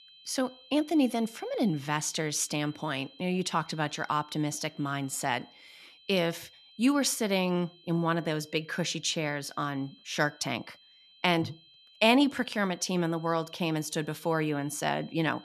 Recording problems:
high-pitched whine; faint; throughout; 3 kHz, 25 dB below the speech

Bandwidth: 13.5 kHz